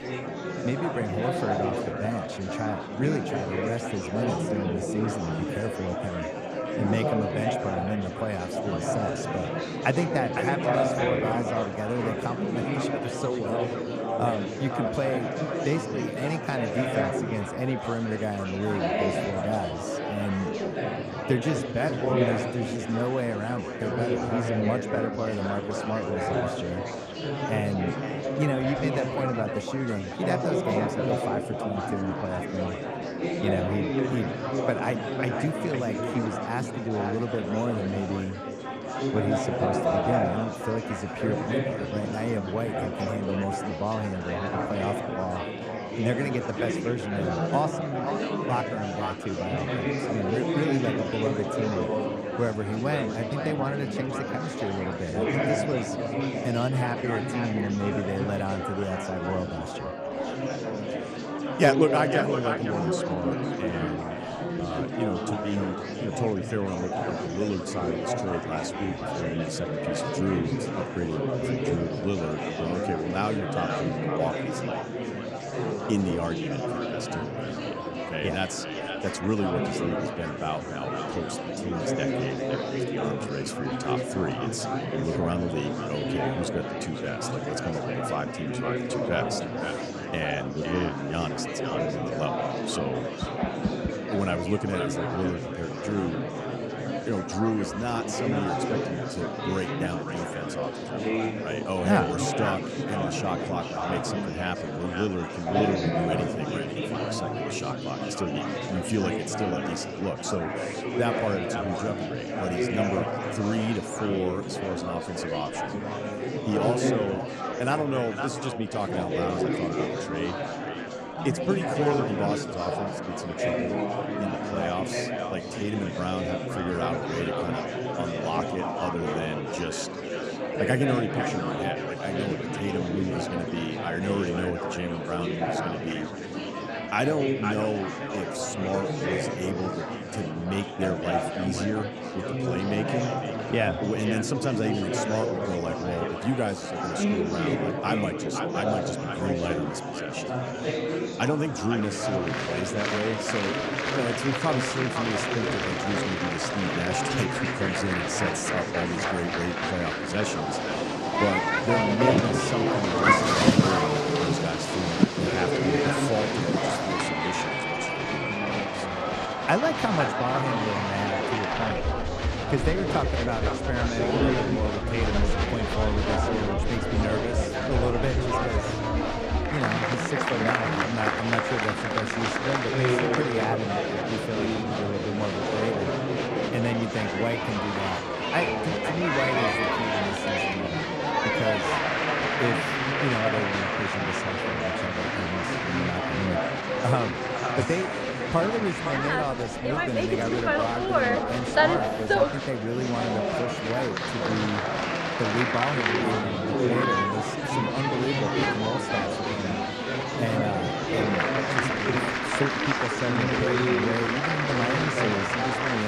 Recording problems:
echo of what is said; strong; throughout; 510 ms later, 10 dB below the speech
murmuring crowd; very loud; throughout; 2 dB above the speech
abrupt cut into speech; at the end

